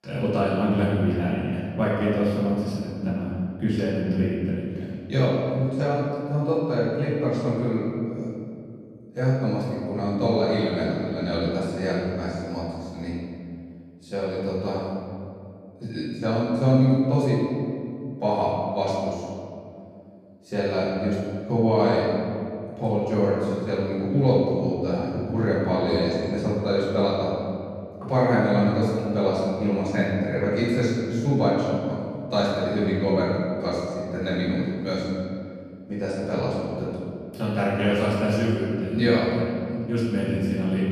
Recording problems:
room echo; strong; dies away in 2.3 s
off-mic speech; far

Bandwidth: 14.5 kHz